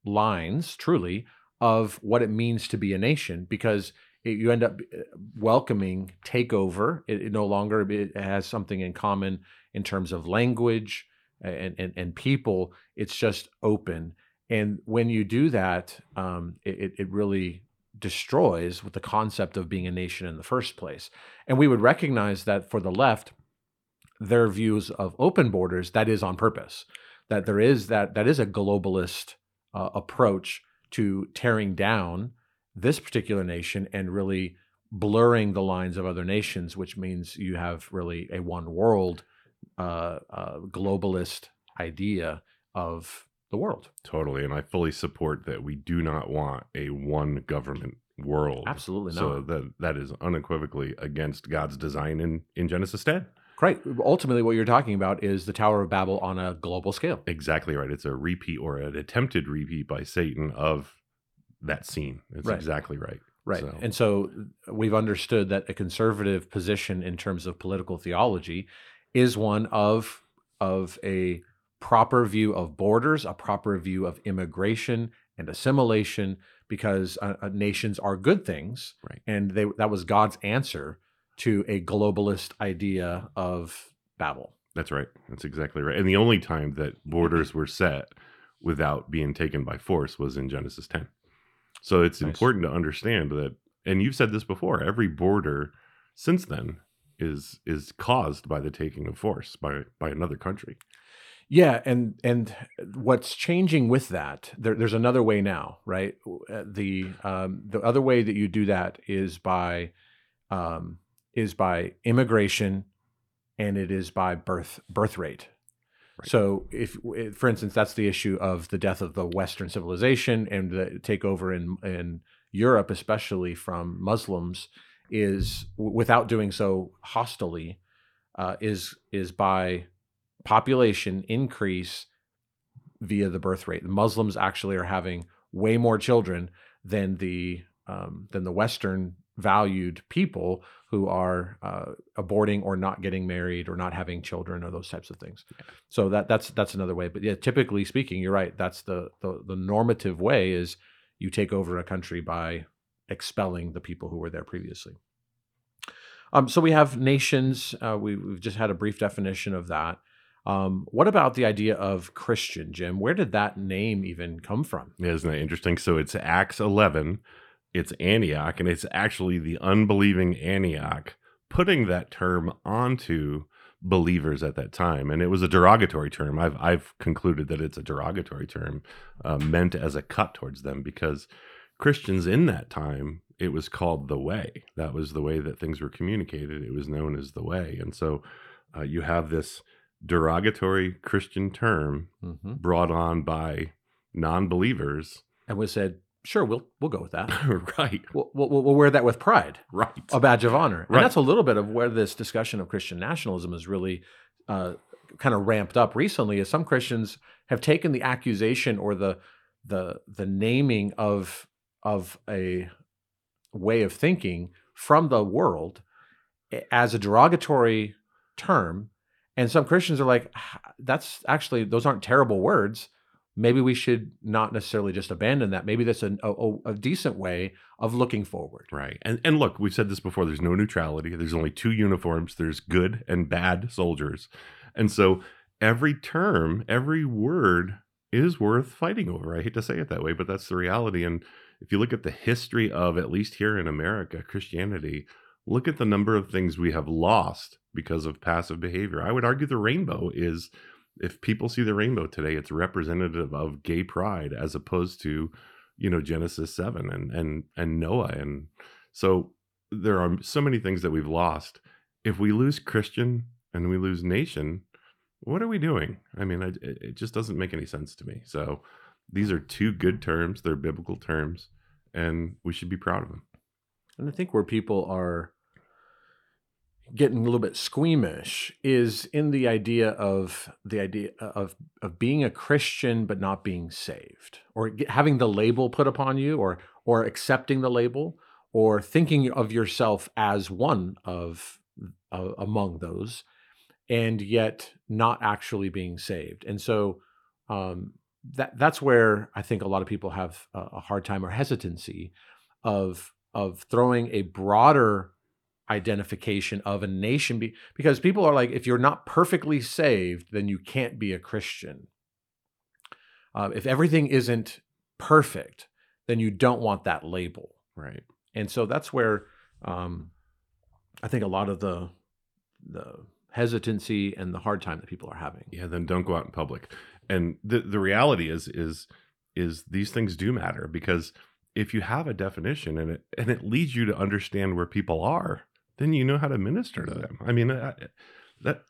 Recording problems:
none

